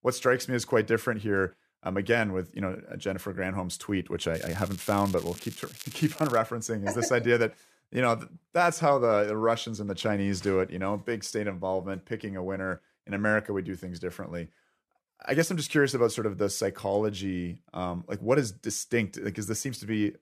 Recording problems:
crackling; noticeable; from 4.5 to 6.5 s; 15 dB below the speech

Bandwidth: 14.5 kHz